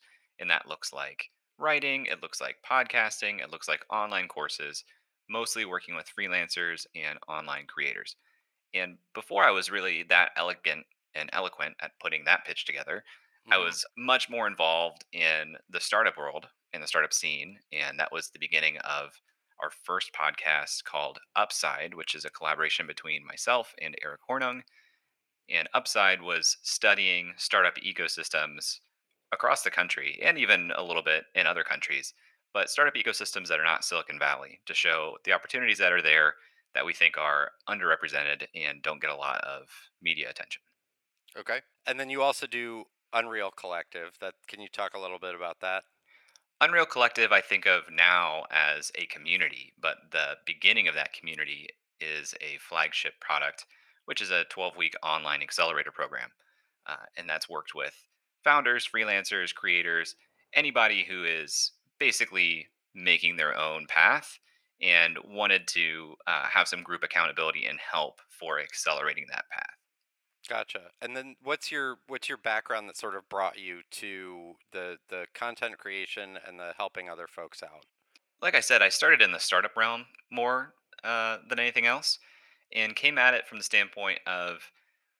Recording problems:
thin; very; fading below 700 Hz

